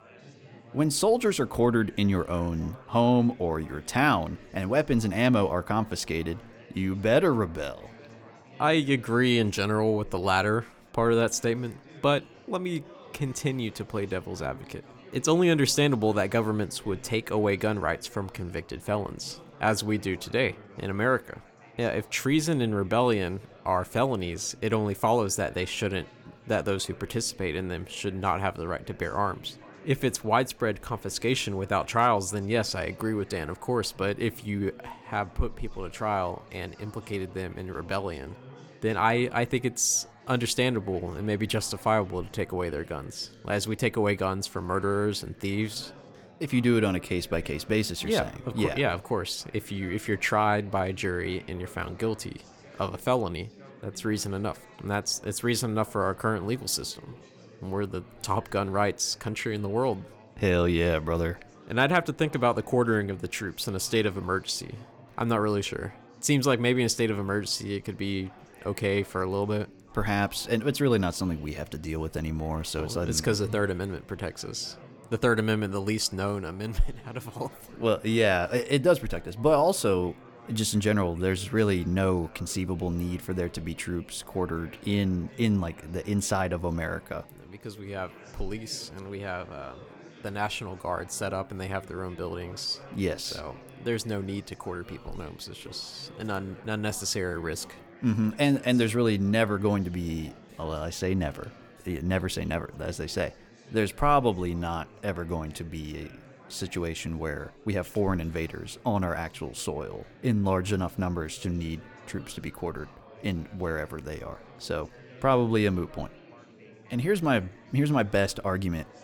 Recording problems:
chatter from many people; faint; throughout; 20 dB below the speech

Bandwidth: 18 kHz